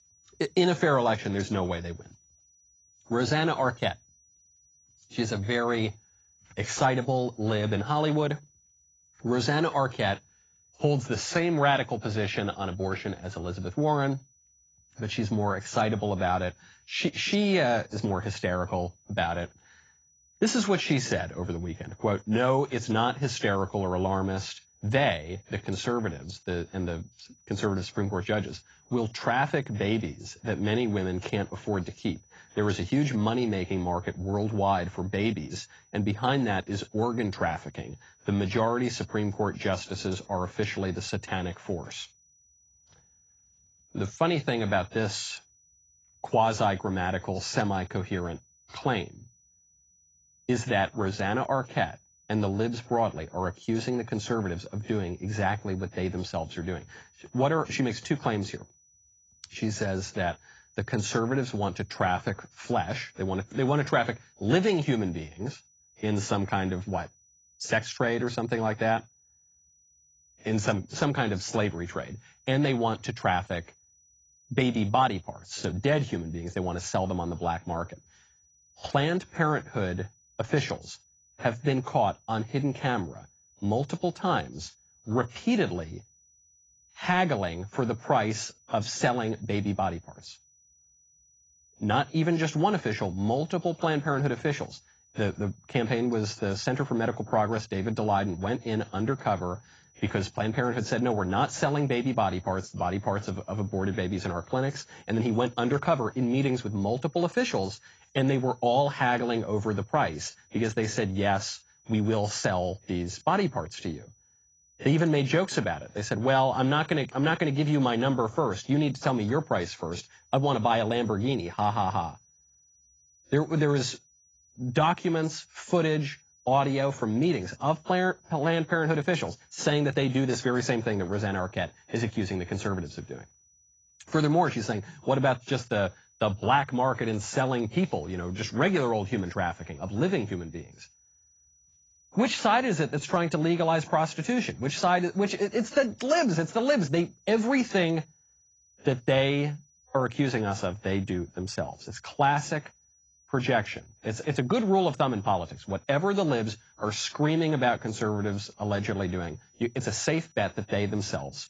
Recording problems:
garbled, watery; badly; nothing above 7.5 kHz
high-pitched whine; faint; throughout; 6 kHz, 30 dB below the speech

